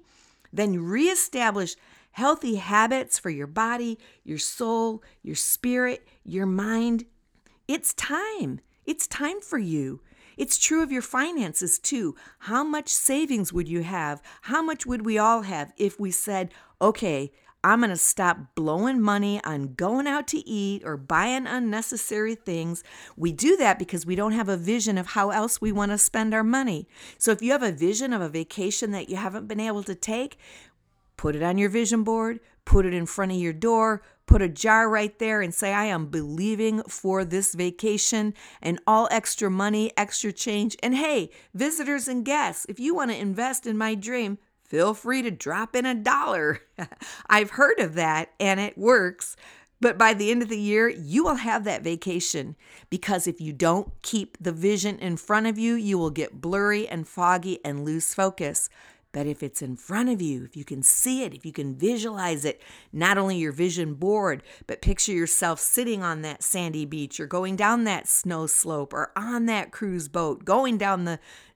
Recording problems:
none

